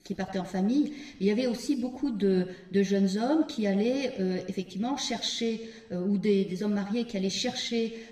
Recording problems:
room echo; slight; dies away in 0.8 s
off-mic speech; somewhat distant

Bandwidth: 15 kHz